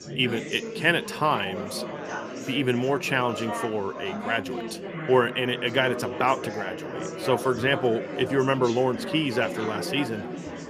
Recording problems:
chatter from many people; loud; throughout; 8 dB below the speech

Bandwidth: 15 kHz